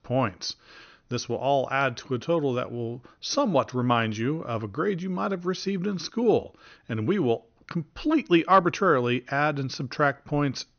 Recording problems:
high frequencies cut off; noticeable; nothing above 6.5 kHz

